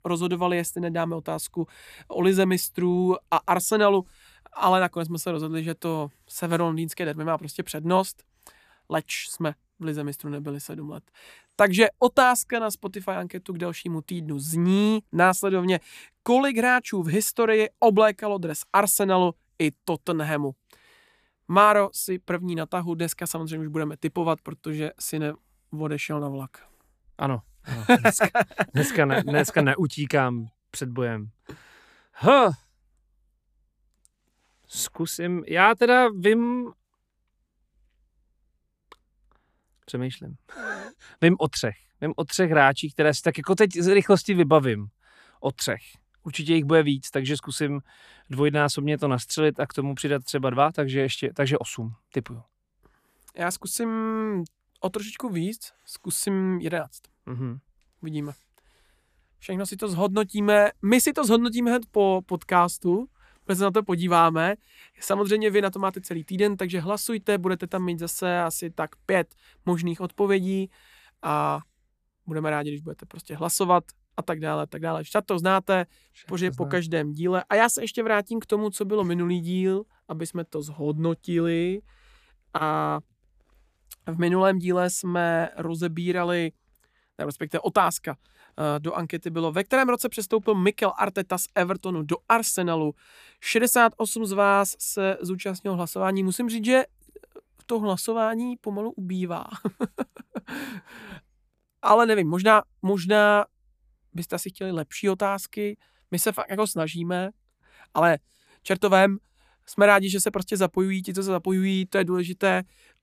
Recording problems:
none

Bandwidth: 14.5 kHz